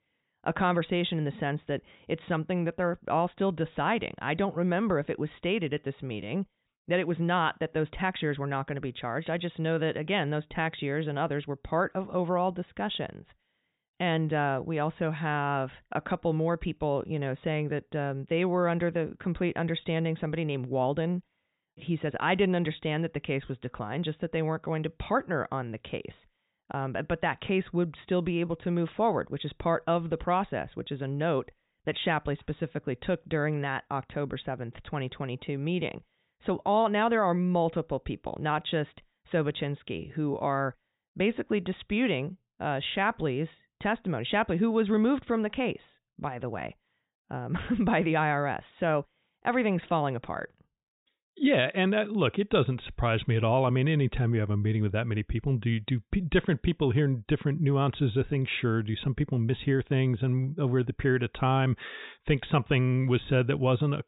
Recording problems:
high frequencies cut off; severe; nothing above 4 kHz

